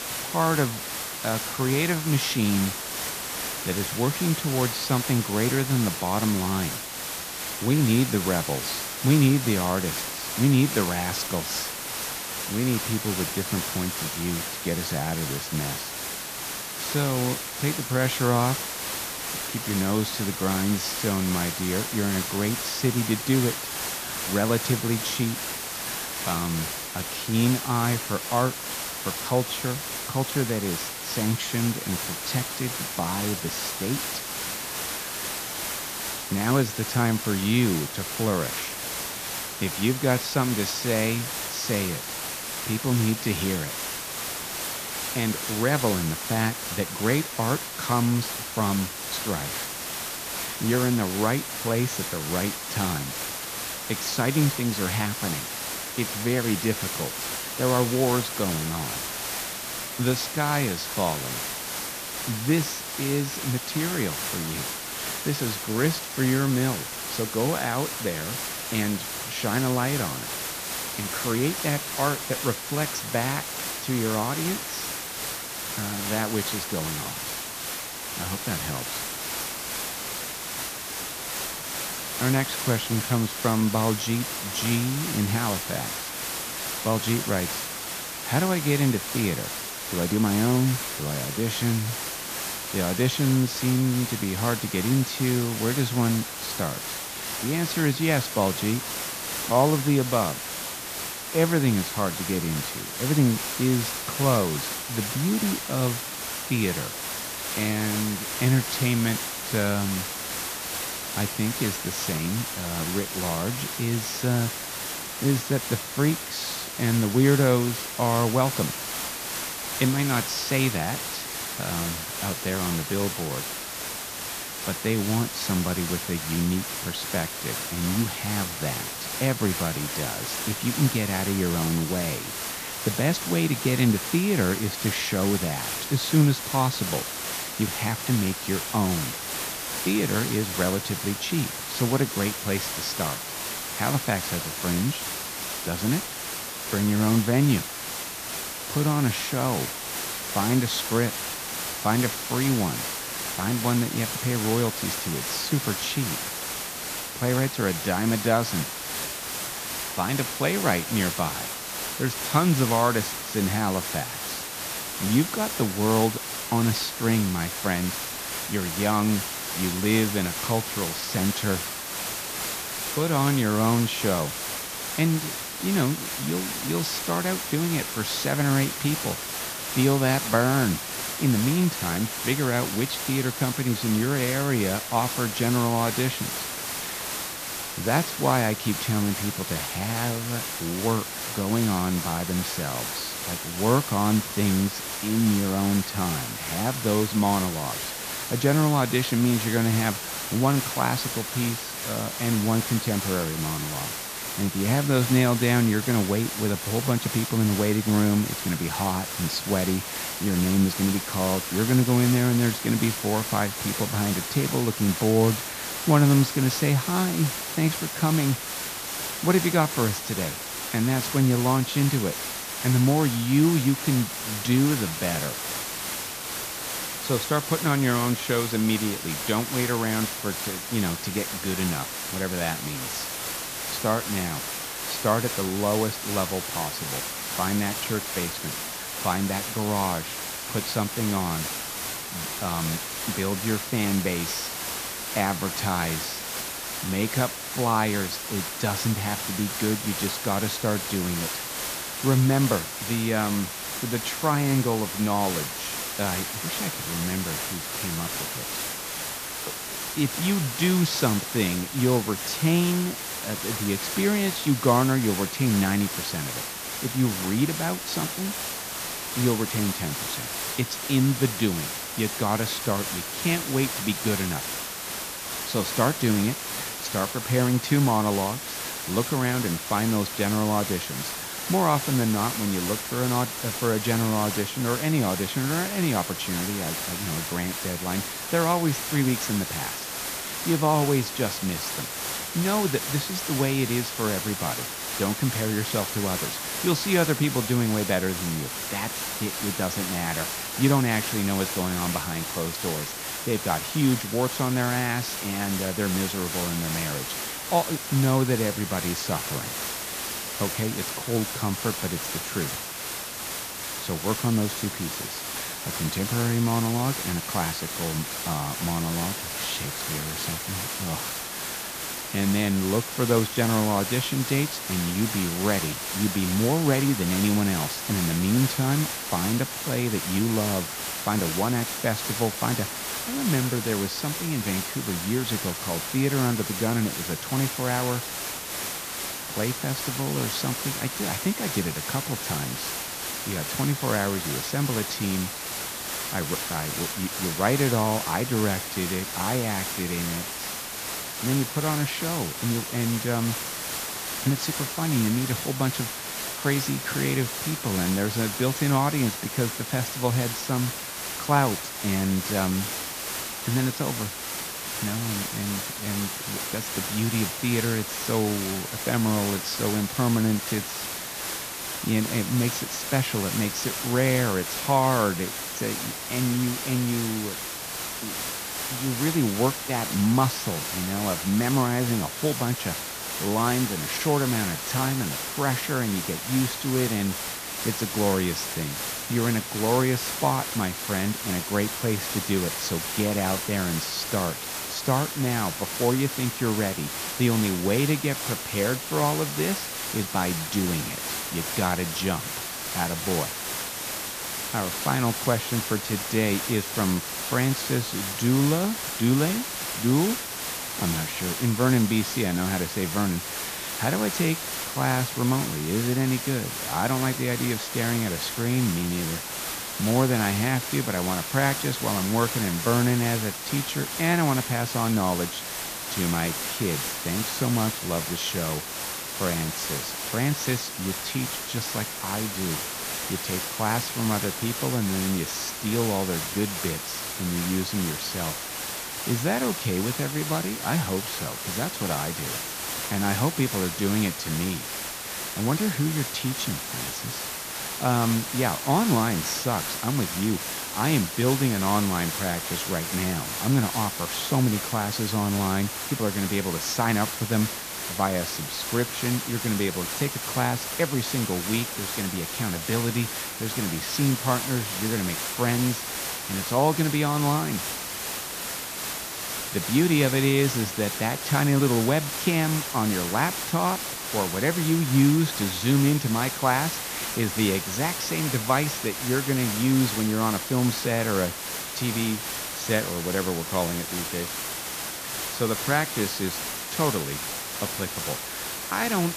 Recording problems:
high frequencies cut off; noticeable; nothing above 8 kHz
hiss; loud; throughout; 3 dB below the speech

